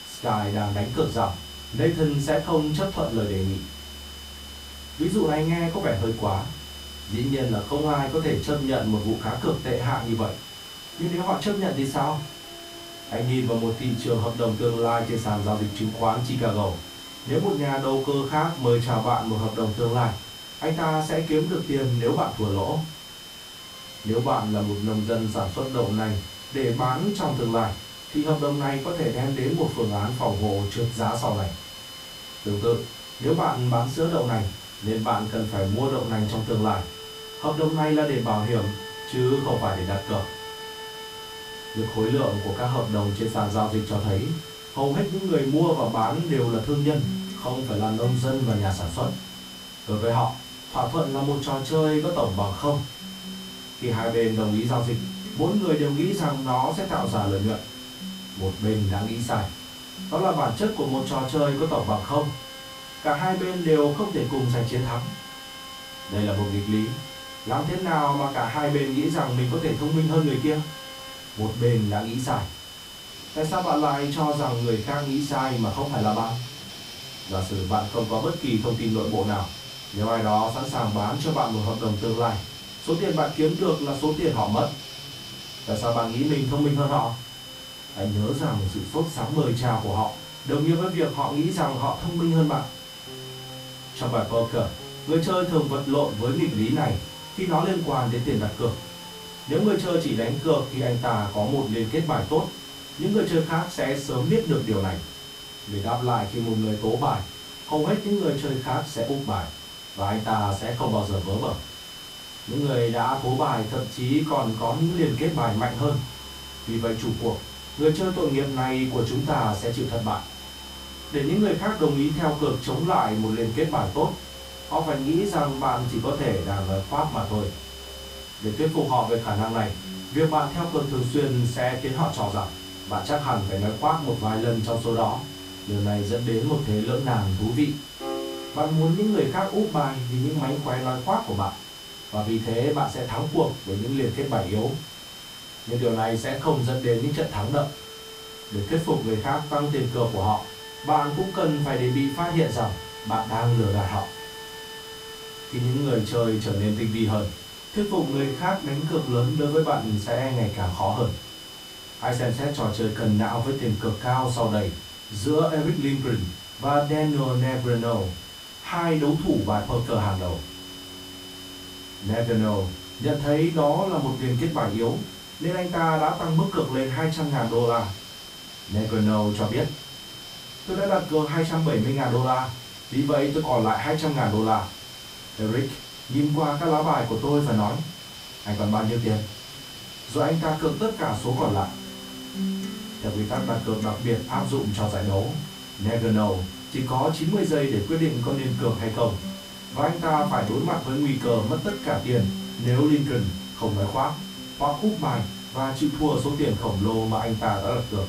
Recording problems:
off-mic speech; far
room echo; slight; dies away in 0.3 s
high-pitched whine; noticeable; throughout; 3 kHz, 15 dB below the speech
background music; noticeable; throughout; 15 dB below the speech
hiss; noticeable; throughout; 15 dB below the speech

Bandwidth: 15.5 kHz